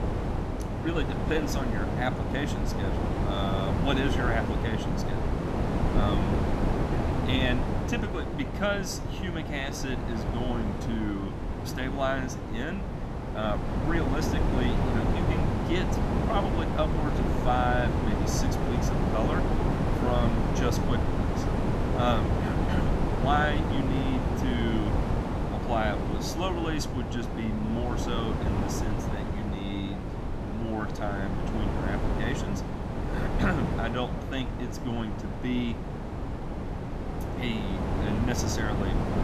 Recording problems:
wind noise on the microphone; heavy; 1 dB below the speech

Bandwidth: 13.5 kHz